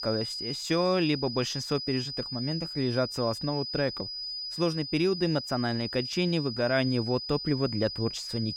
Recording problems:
high-pitched whine; loud; throughout; 5 kHz, 5 dB below the speech

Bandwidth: 18.5 kHz